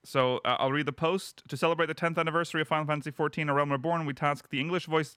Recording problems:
none

